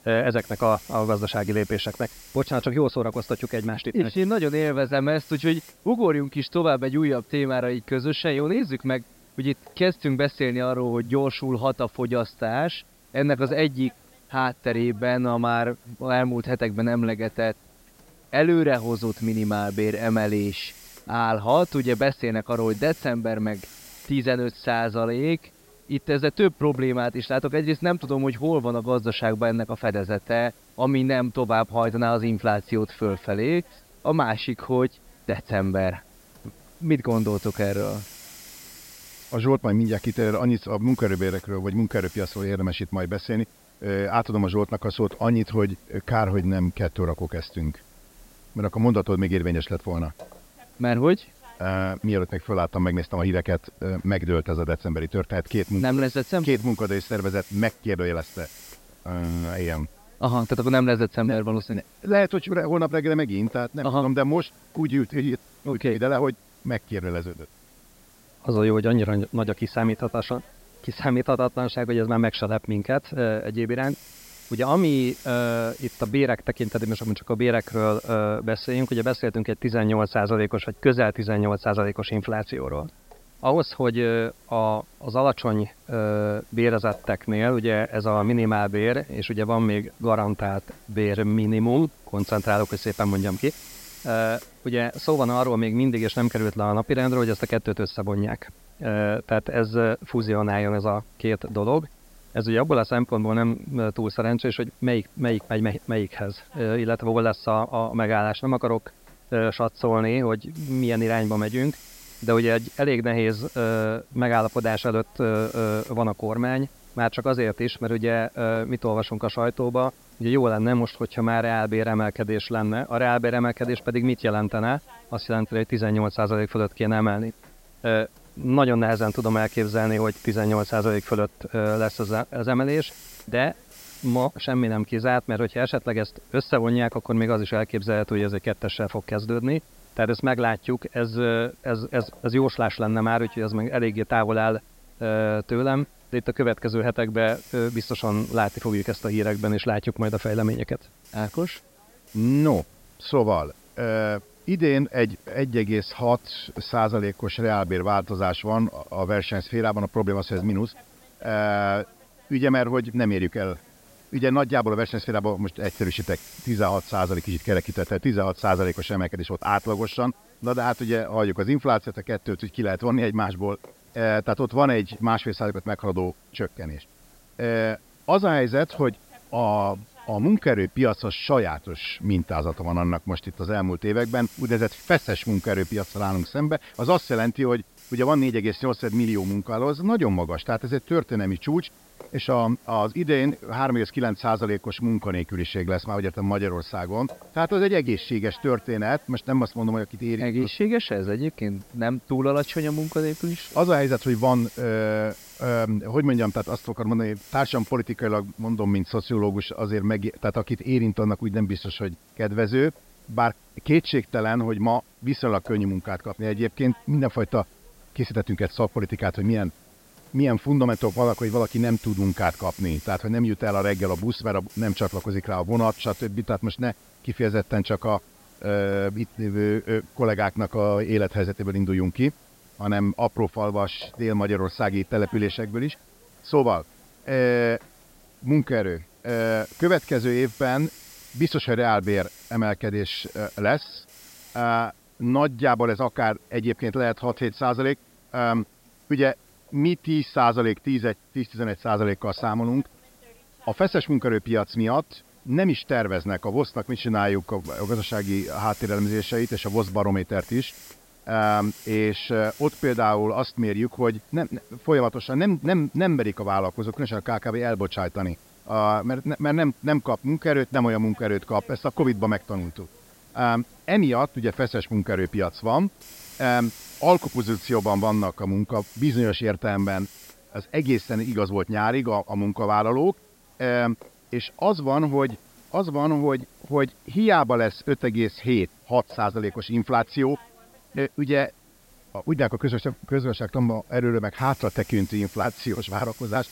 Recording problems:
high frequencies cut off; noticeable; nothing above 5.5 kHz
hiss; faint; throughout; 25 dB below the speech

